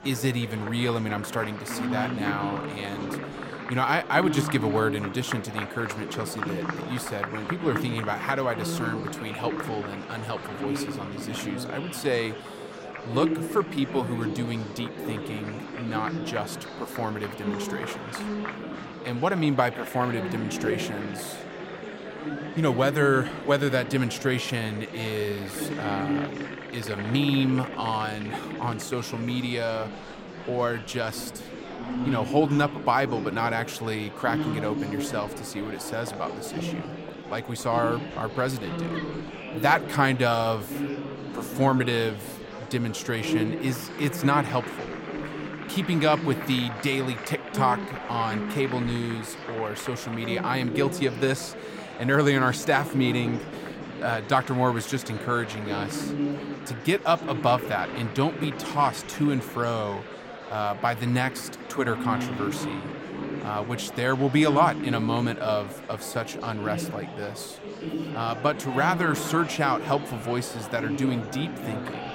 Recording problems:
murmuring crowd; loud; throughout; 6 dB below the speech

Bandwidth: 16 kHz